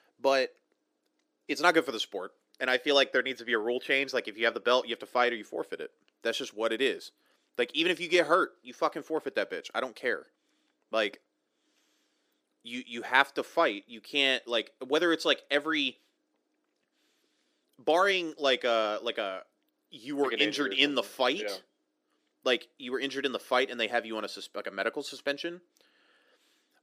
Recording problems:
thin; somewhat; fading below 300 Hz

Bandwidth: 15 kHz